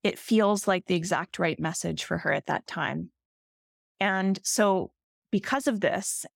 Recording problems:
none

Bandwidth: 17 kHz